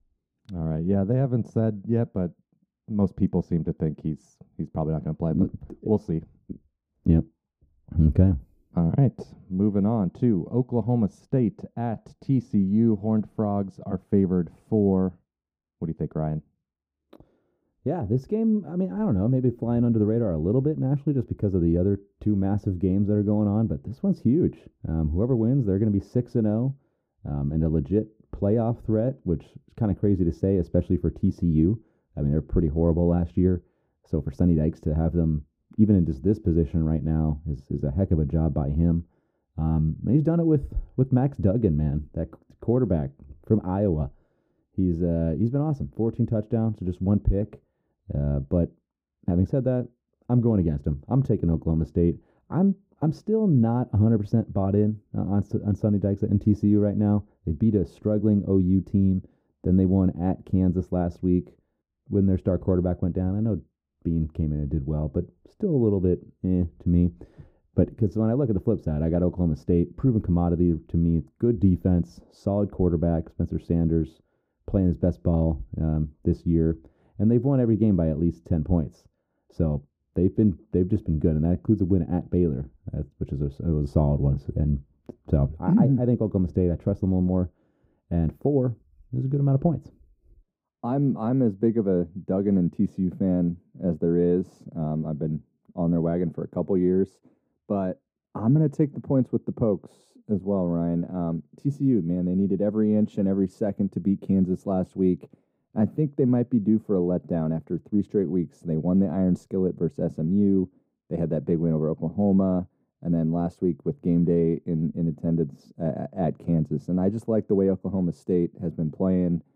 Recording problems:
muffled; very; fading above 1 kHz

